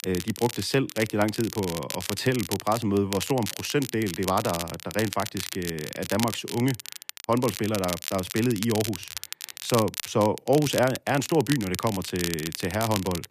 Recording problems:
crackle, like an old record; loud; 8 dB below the speech

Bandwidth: 14.5 kHz